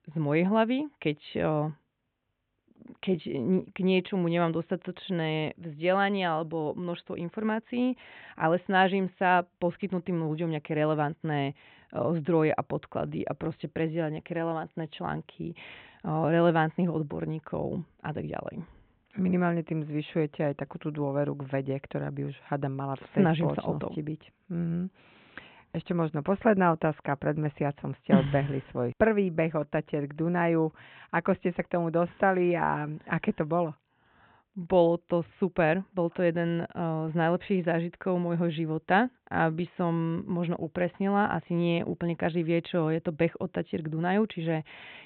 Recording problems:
high frequencies cut off; severe; nothing above 3.5 kHz

